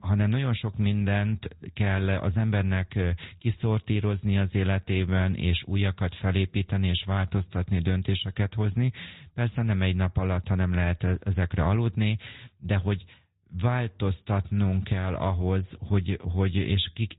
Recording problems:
high frequencies cut off; severe; nothing above 4 kHz
garbled, watery; slightly

